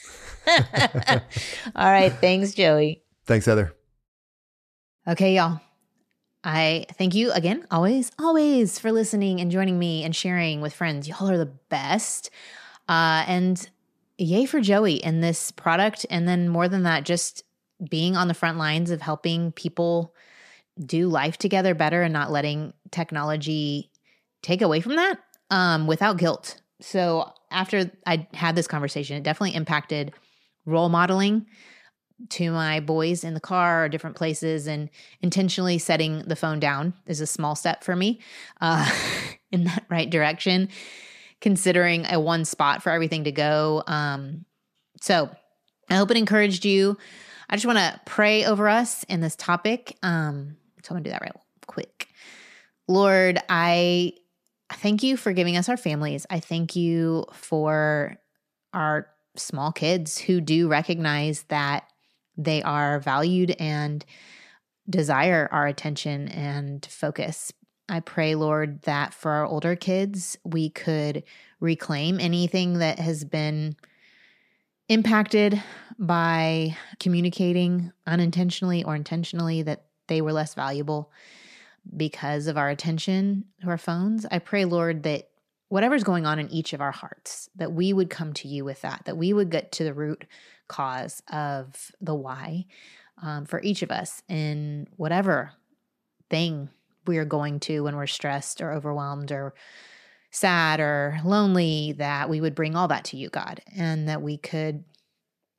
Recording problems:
none

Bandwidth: 14.5 kHz